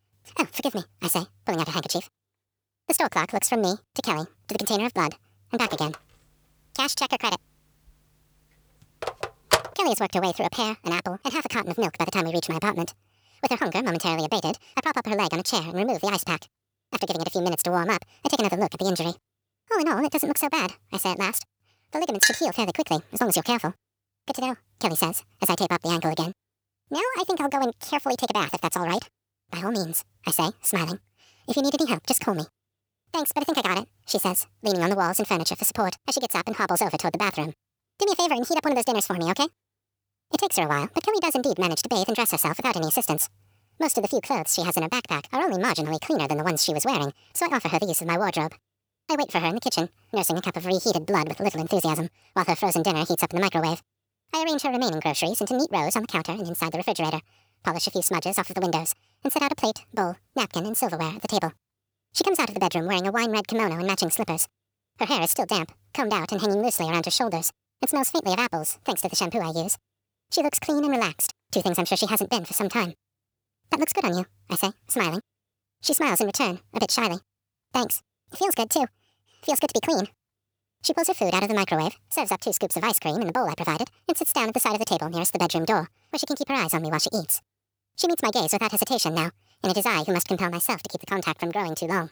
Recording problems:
wrong speed and pitch; too fast and too high; 1.7 times normal speed
phone ringing; loud; from 5.5 to 9.5 s; peak 2 dB above the speech
clattering dishes; loud; at 22 s; peak 4 dB above the speech

